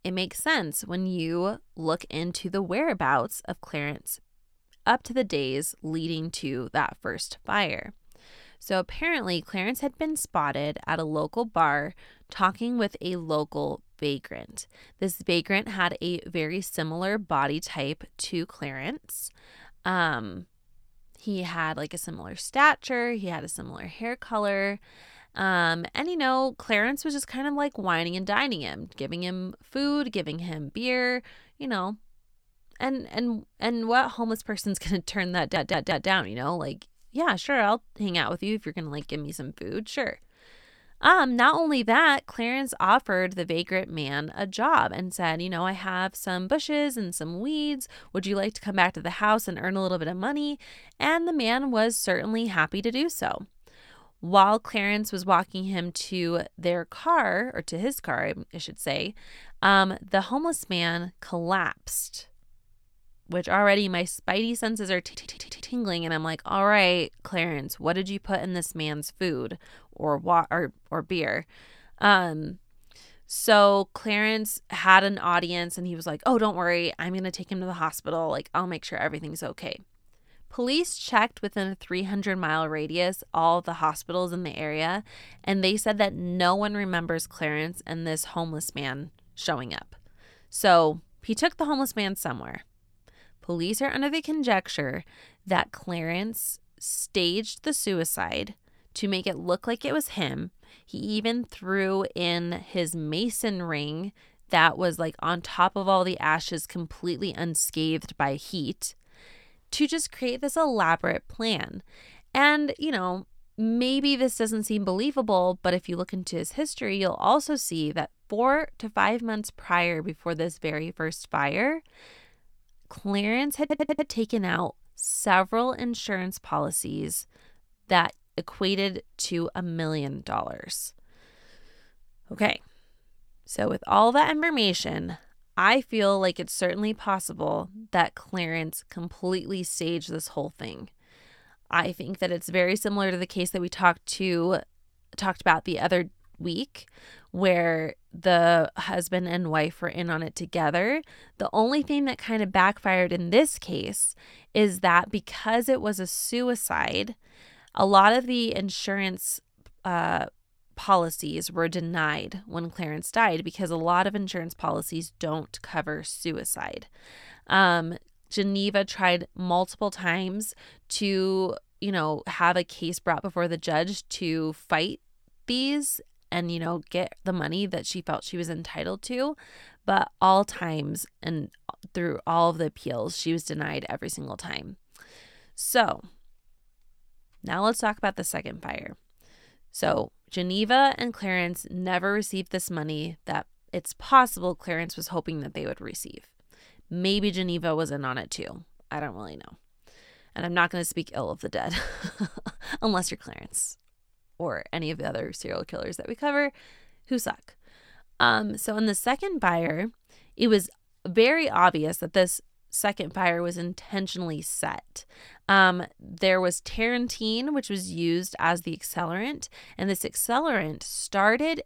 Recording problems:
audio stuttering; at 35 s, at 1:05 and at 2:04

